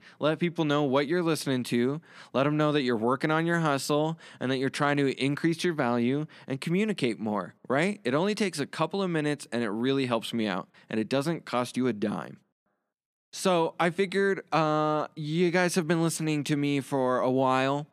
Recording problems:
none

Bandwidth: 14 kHz